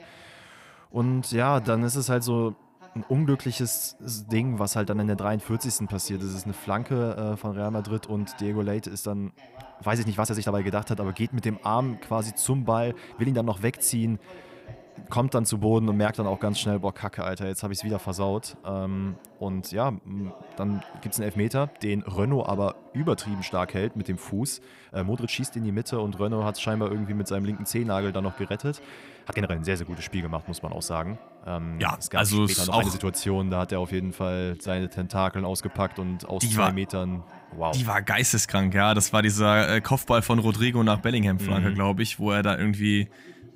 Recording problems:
voice in the background; faint; throughout; 20 dB below the speech
uneven, jittery; strongly; from 1 to 35 s

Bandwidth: 15.5 kHz